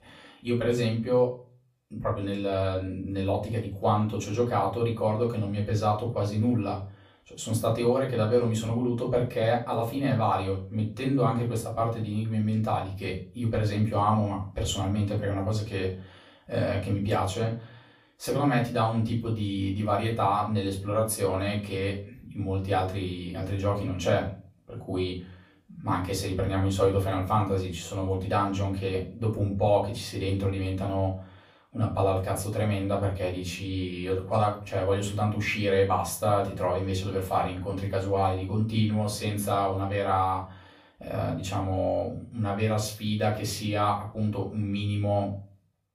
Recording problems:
off-mic speech; far
room echo; slight; dies away in 0.3 s

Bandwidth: 15 kHz